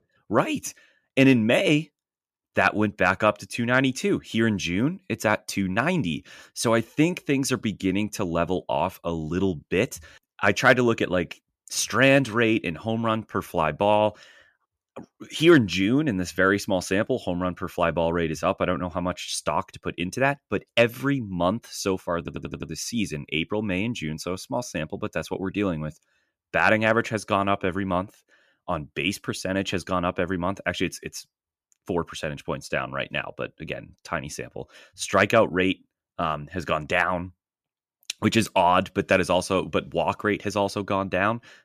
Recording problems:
audio stuttering; at 22 s

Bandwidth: 14.5 kHz